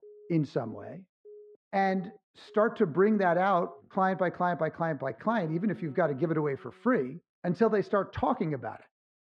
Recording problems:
muffled; very; fading above 1.5 kHz
alarms or sirens; faint; until 6.5 s; 25 dB below the speech

